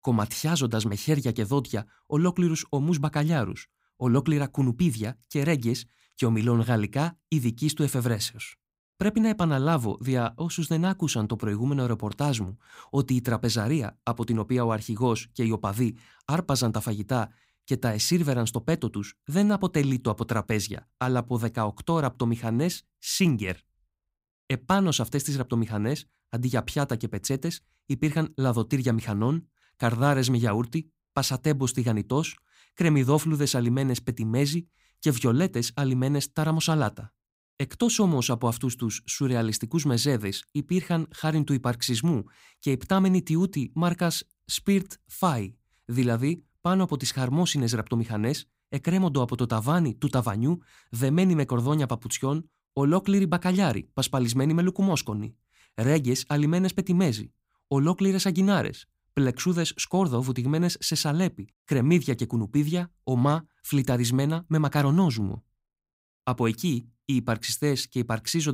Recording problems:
abrupt cut into speech; at the end

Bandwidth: 15.5 kHz